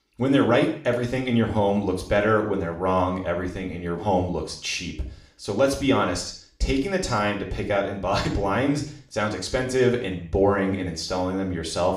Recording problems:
room echo; slight; dies away in 0.5 s
off-mic speech; somewhat distant

